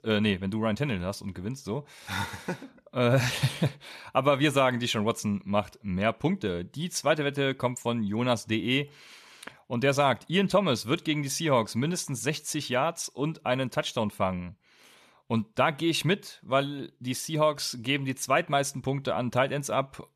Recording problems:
none

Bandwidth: 14 kHz